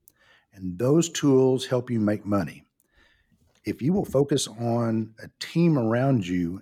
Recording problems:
uneven, jittery; strongly; from 0.5 to 6 s

